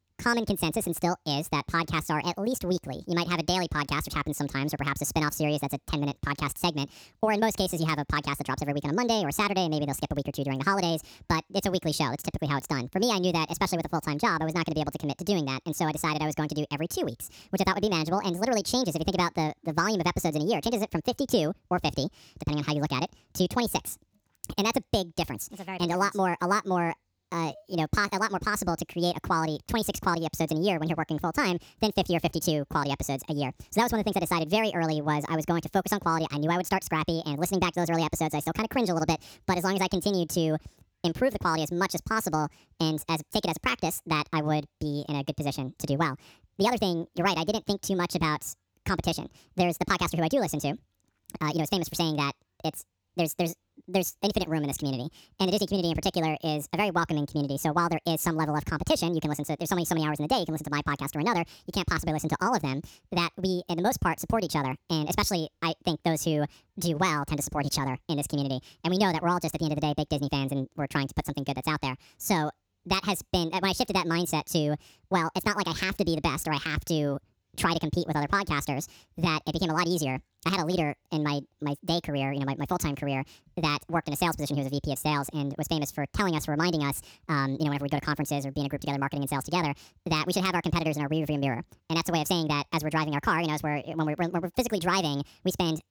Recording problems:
wrong speed and pitch; too fast and too high; 1.5 times normal speed

